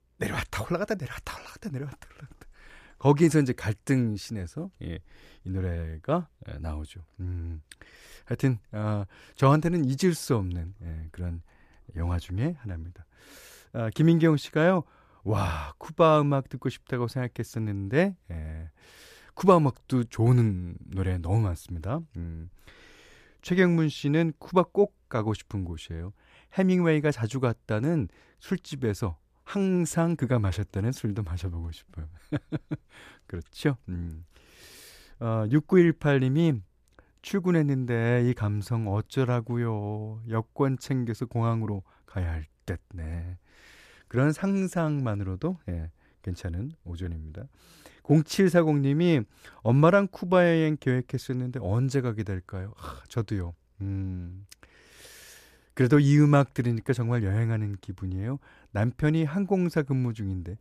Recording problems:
none

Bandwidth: 14.5 kHz